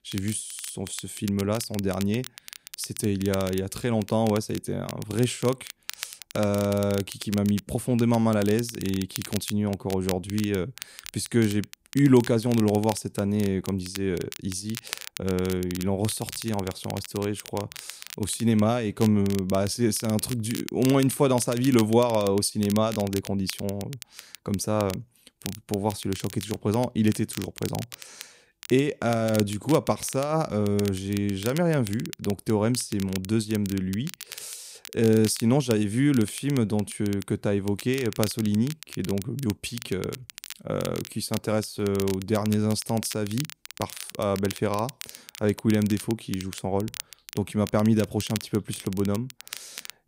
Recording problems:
crackle, like an old record; noticeable; 15 dB below the speech

